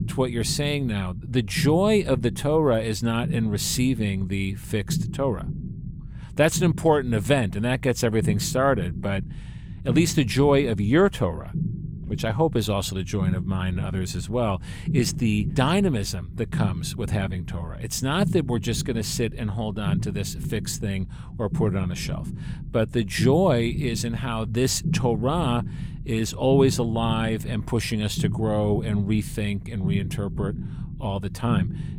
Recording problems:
low rumble; noticeable; throughout; 15 dB below the speech

